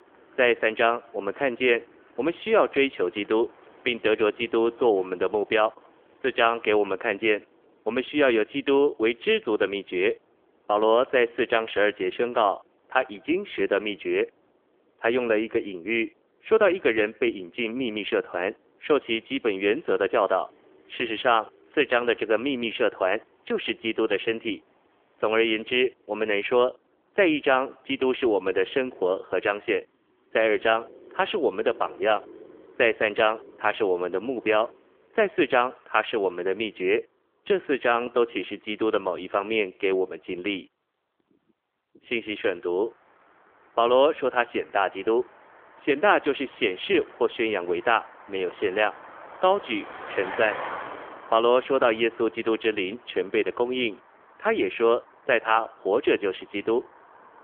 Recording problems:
phone-call audio; nothing above 3.5 kHz
traffic noise; faint; throughout; 20 dB below the speech

